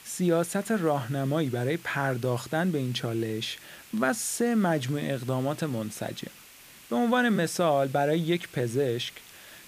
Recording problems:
hiss; faint; throughout; 20 dB below the speech

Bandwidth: 15 kHz